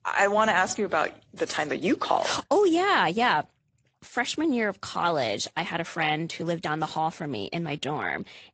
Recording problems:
garbled, watery; slightly; nothing above 7.5 kHz

